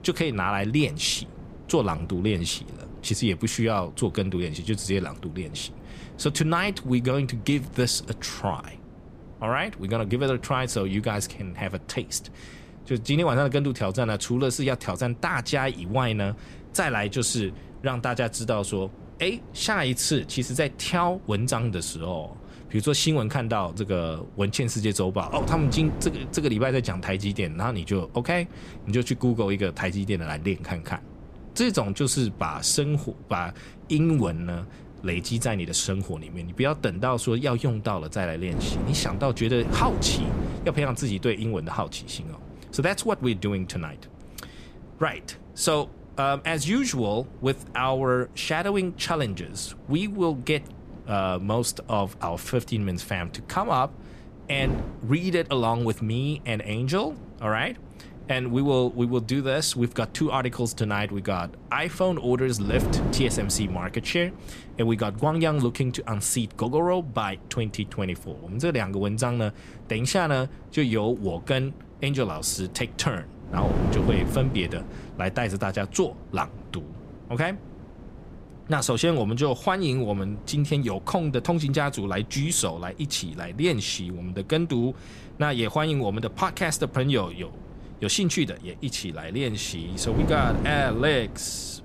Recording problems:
wind noise on the microphone; occasional gusts; 15 dB below the speech

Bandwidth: 14.5 kHz